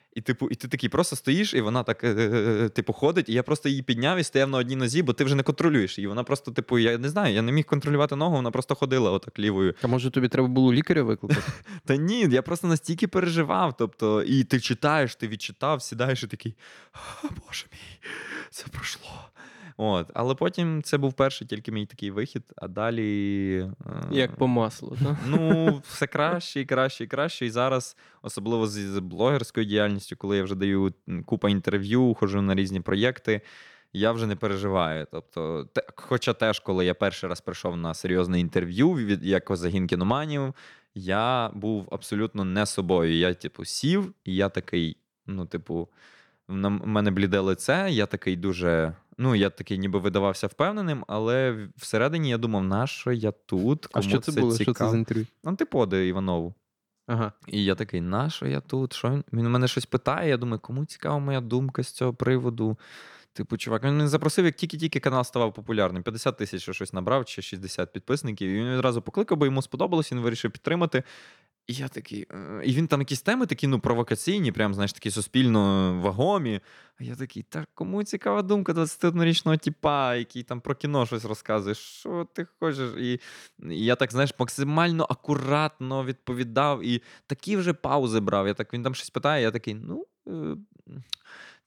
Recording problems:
none

